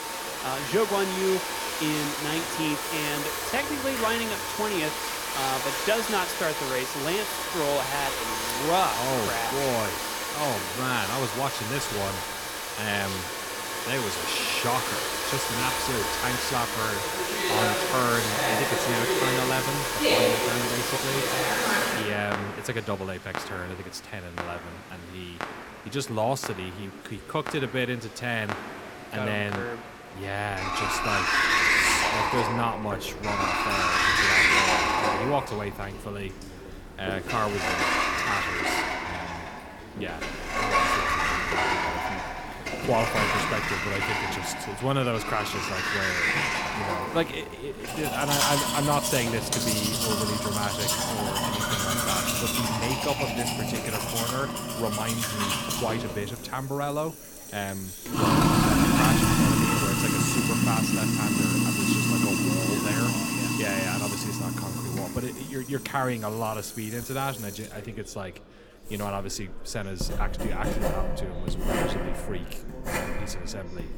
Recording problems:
household noises; very loud; throughout; 5 dB above the speech
murmuring crowd; noticeable; throughout; 15 dB below the speech

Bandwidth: 18 kHz